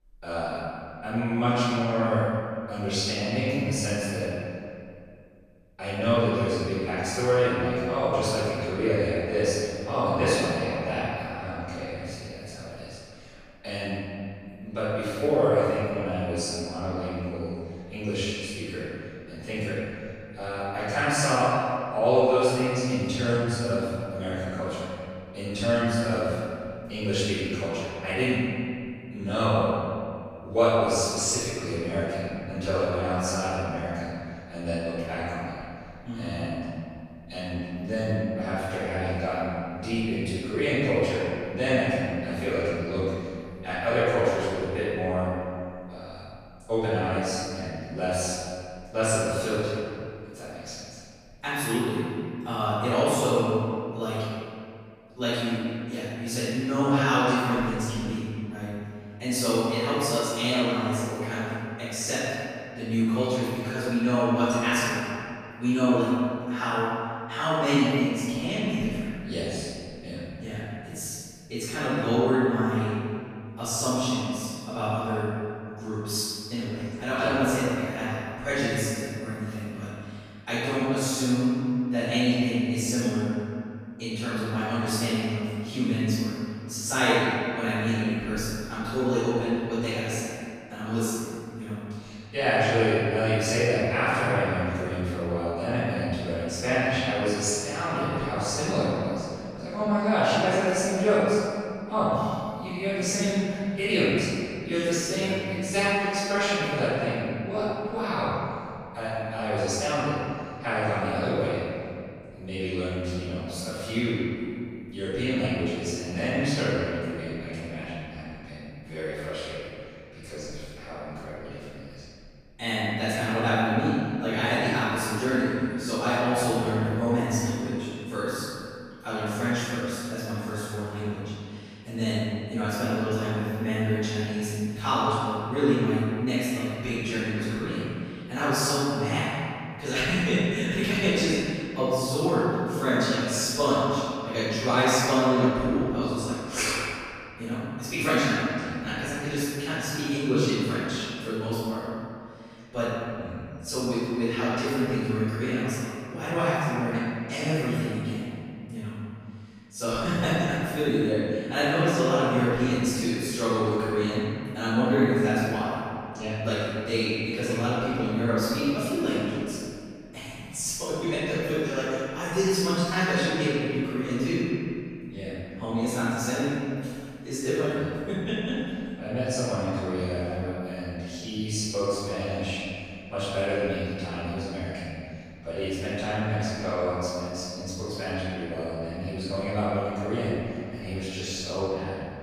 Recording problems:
room echo; strong; dies away in 2.1 s
off-mic speech; far

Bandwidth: 14.5 kHz